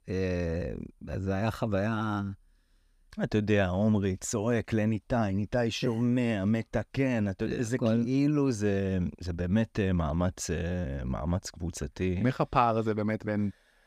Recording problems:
none

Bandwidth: 15 kHz